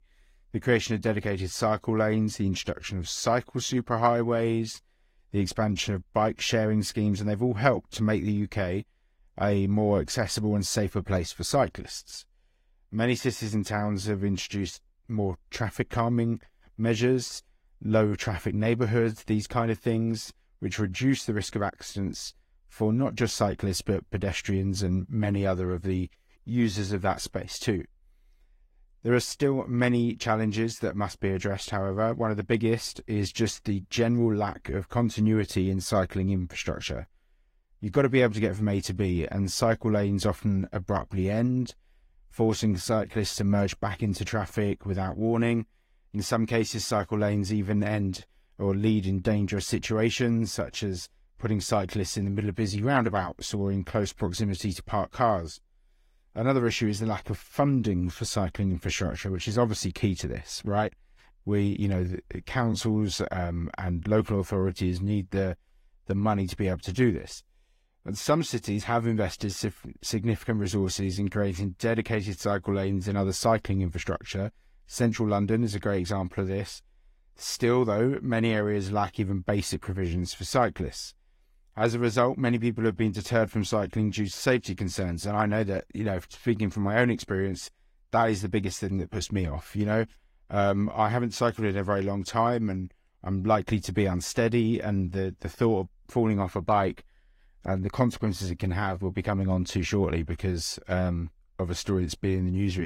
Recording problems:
garbled, watery; slightly; nothing above 16 kHz
abrupt cut into speech; at the end

